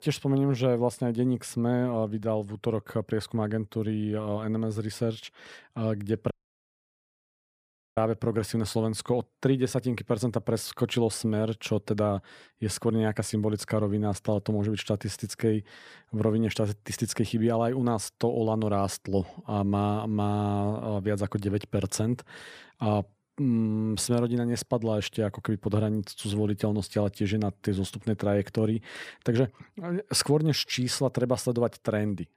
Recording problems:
audio cutting out; at 6.5 s for 1.5 s

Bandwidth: 15 kHz